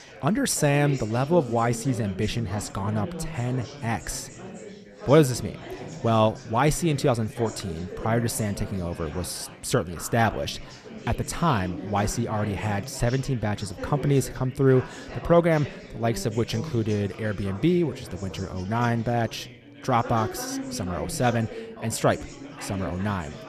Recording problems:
chatter from many people; noticeable; throughout; 10 dB below the speech

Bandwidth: 14 kHz